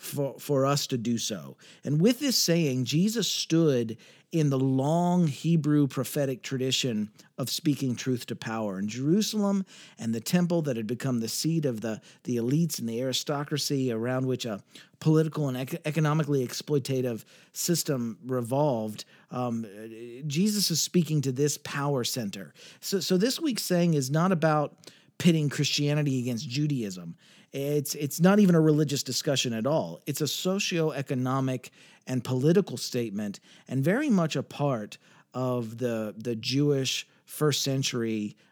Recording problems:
none

